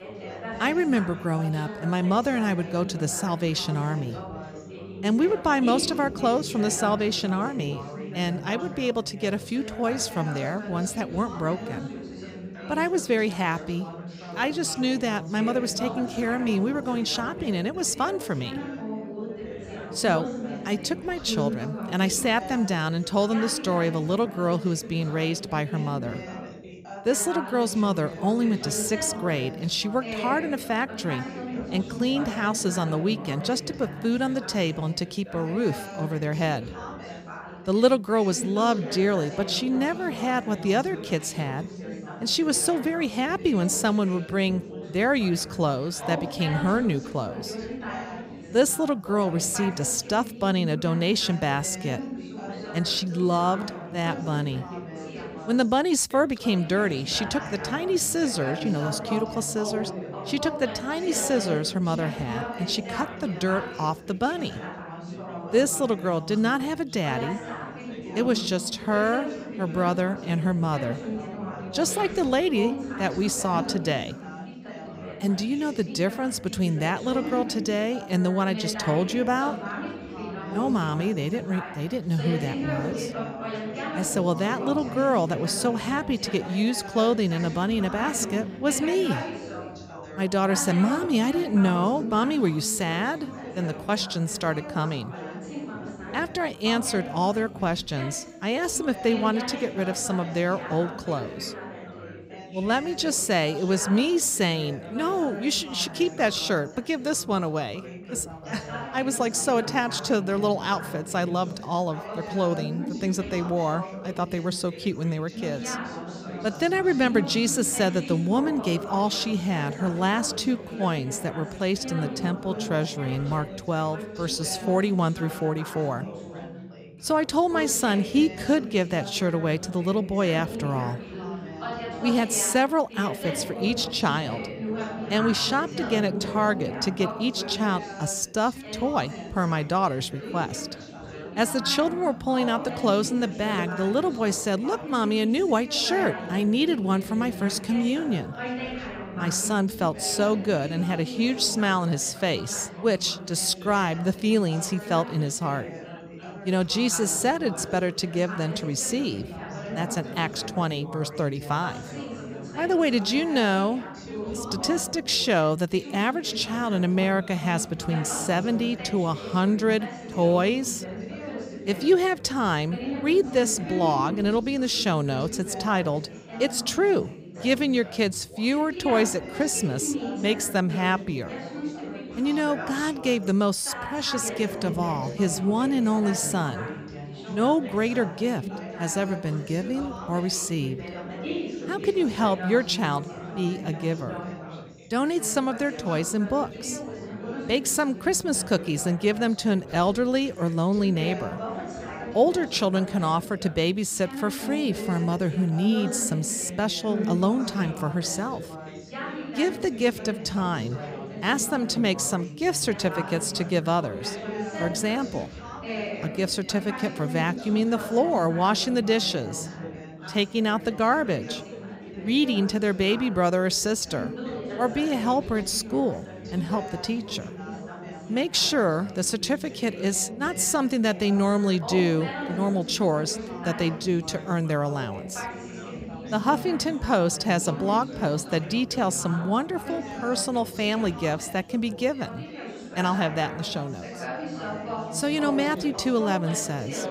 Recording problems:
background chatter; loud; throughout; 3 voices, 10 dB below the speech

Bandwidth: 15.5 kHz